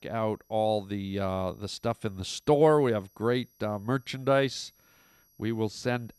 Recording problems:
high-pitched whine; faint; throughout; 11.5 kHz, 35 dB below the speech

